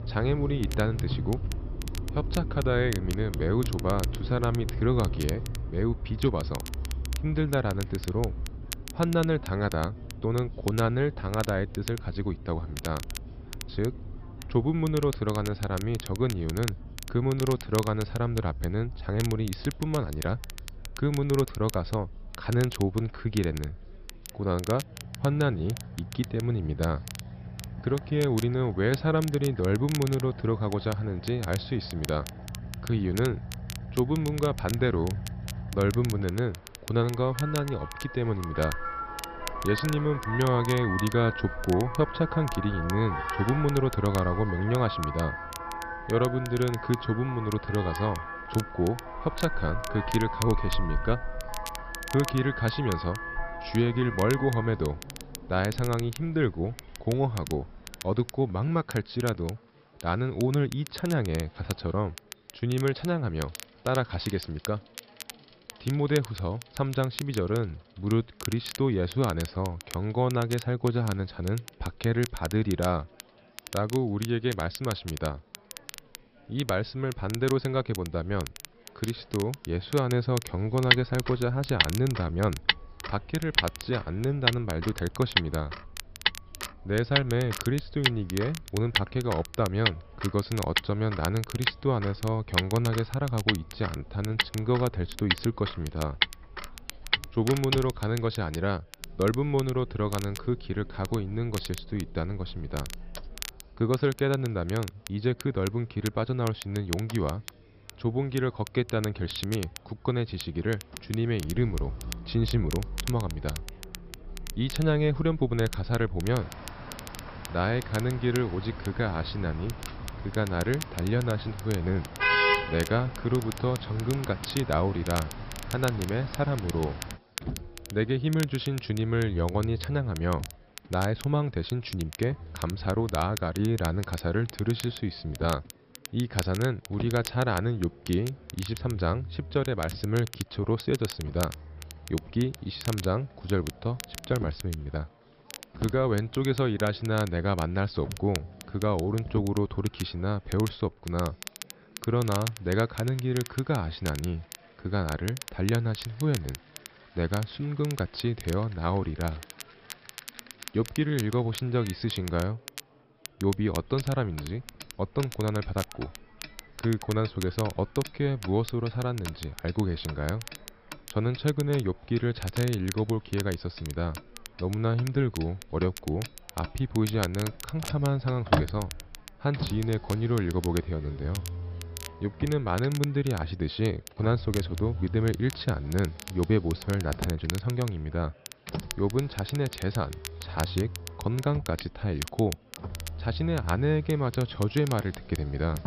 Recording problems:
high frequencies cut off; noticeable; nothing above 5.5 kHz
traffic noise; loud; throughout; 7 dB below the speech
crackle, like an old record; noticeable; 15 dB below the speech
chatter from many people; faint; throughout; 30 dB below the speech

